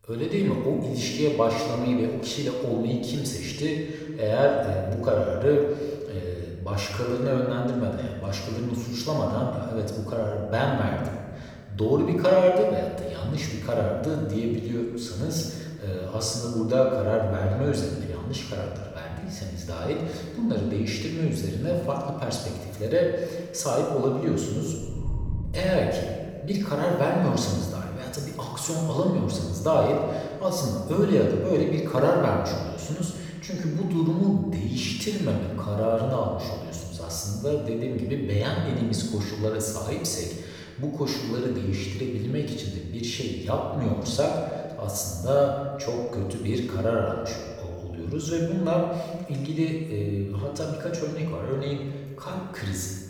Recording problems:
off-mic speech; far
room echo; noticeable; dies away in 1.3 s

